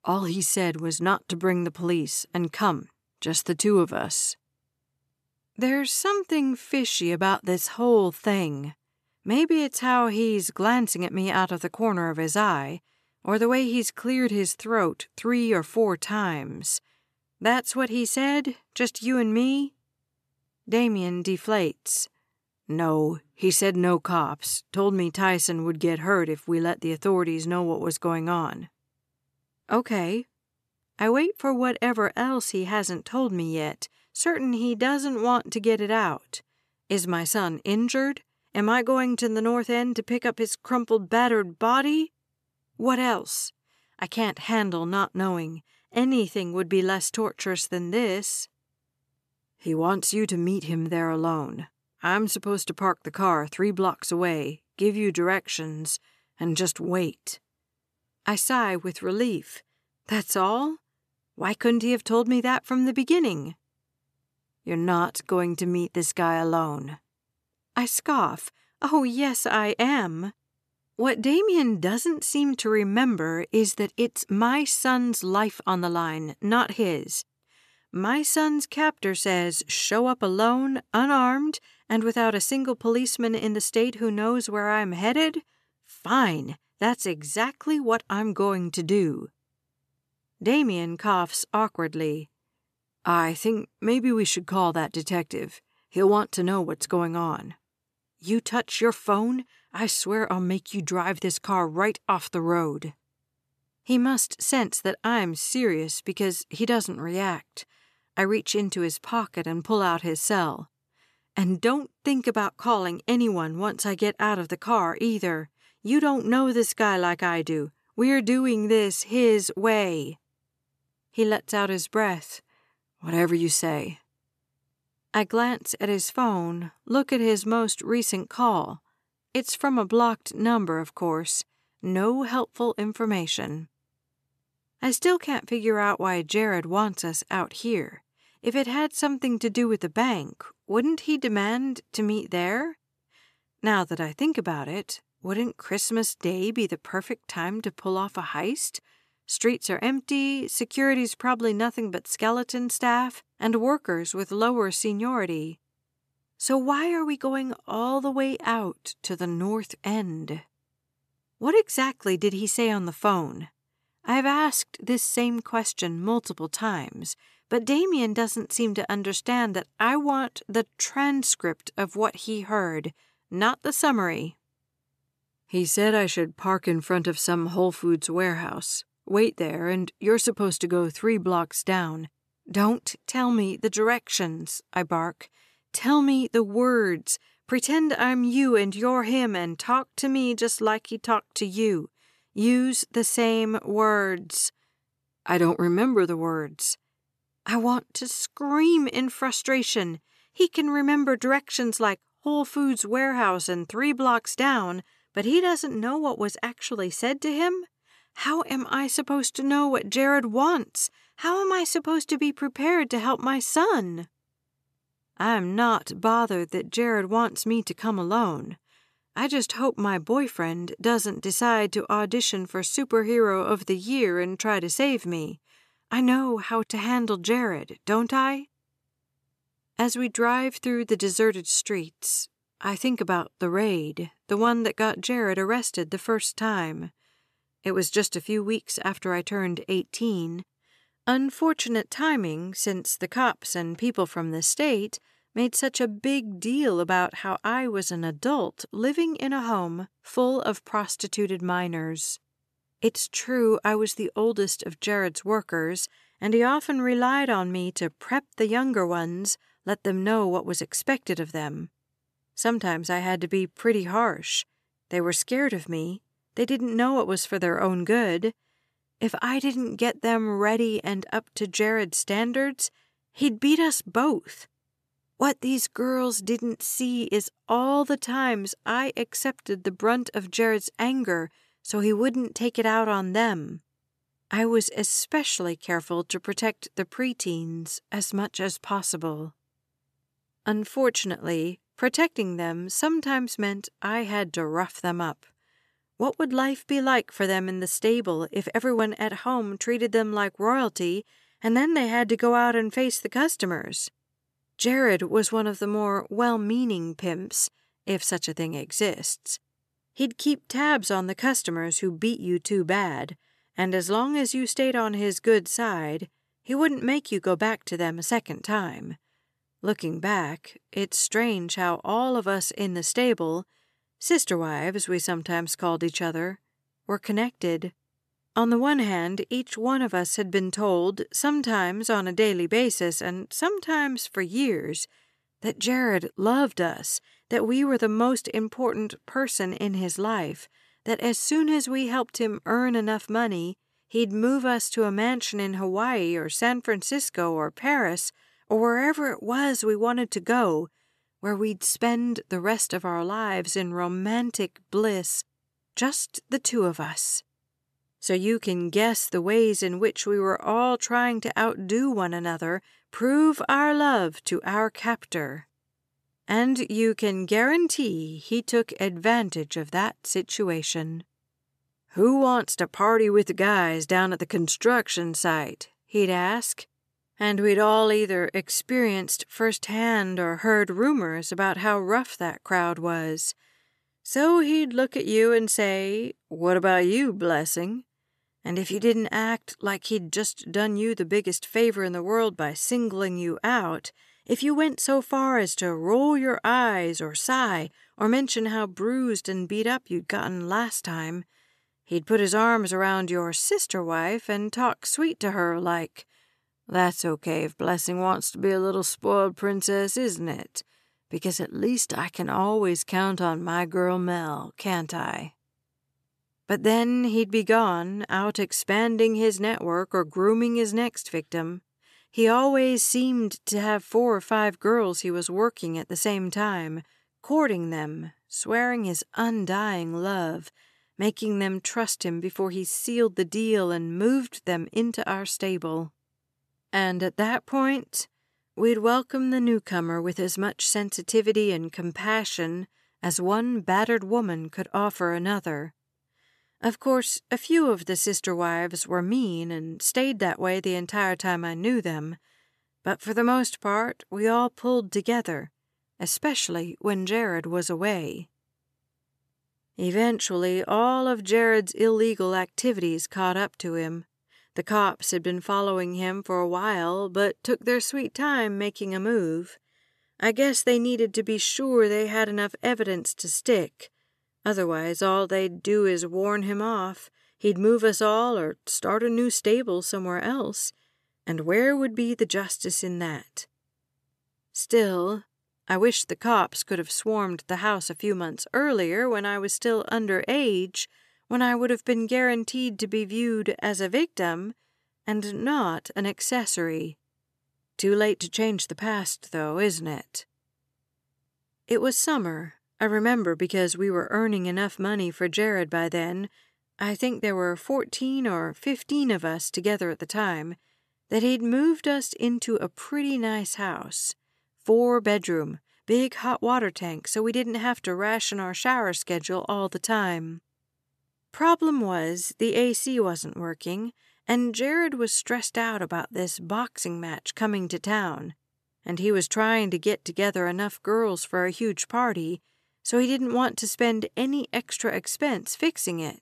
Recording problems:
none

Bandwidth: 14 kHz